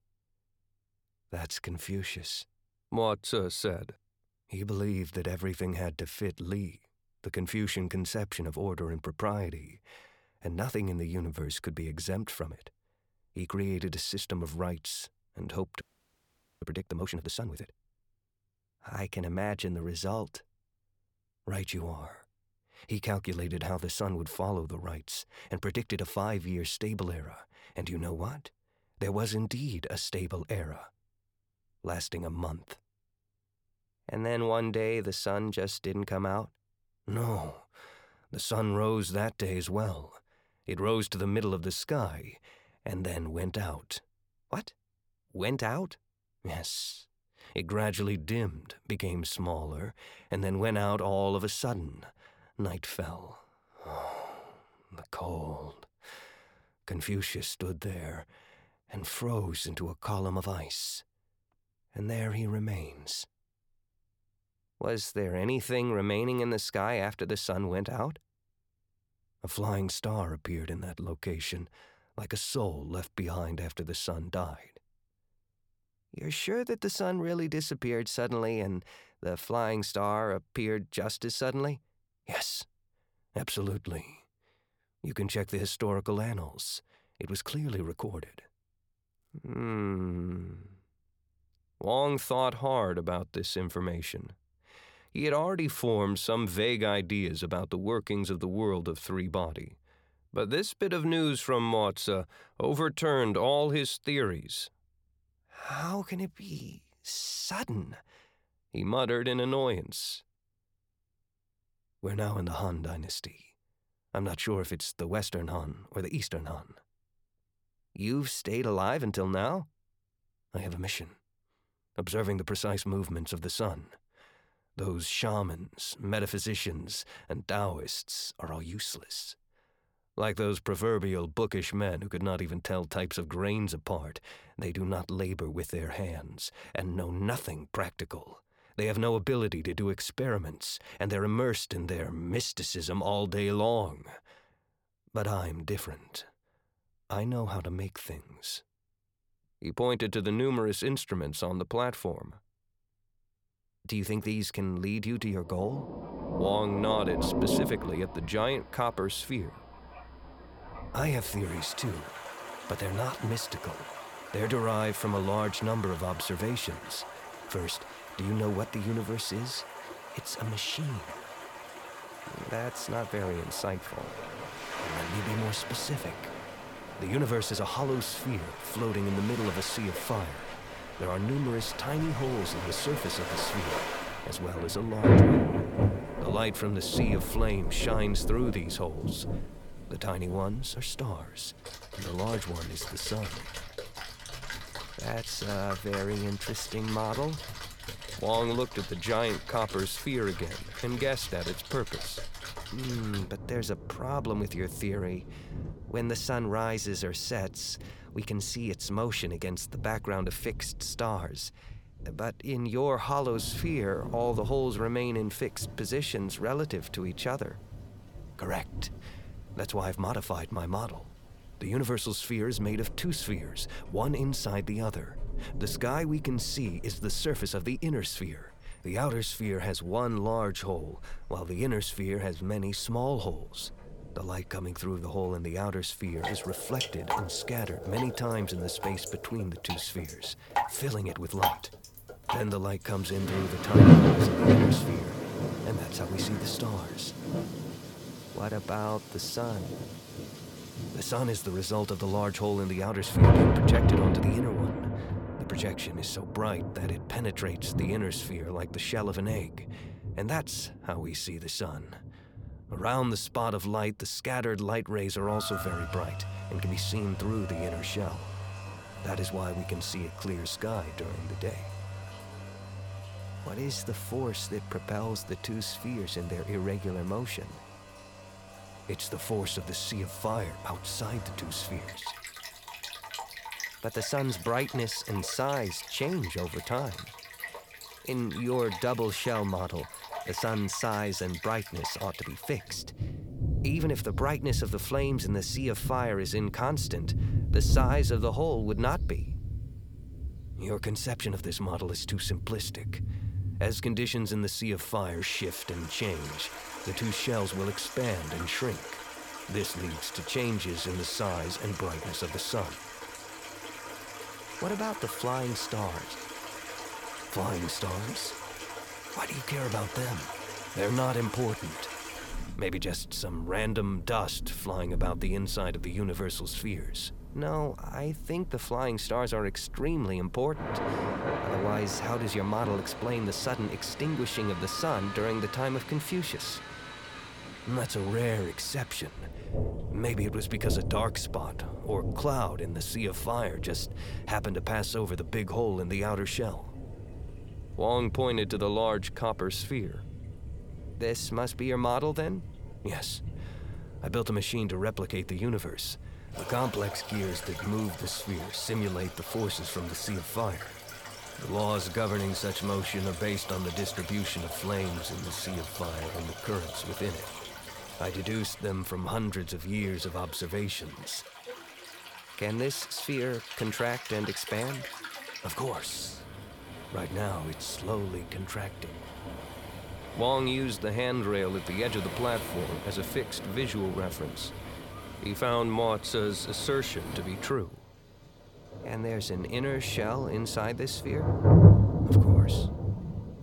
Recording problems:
rain or running water; loud; from 2:36 on; 1 dB below the speech
audio freezing; at 16 s for 1 s

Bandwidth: 18 kHz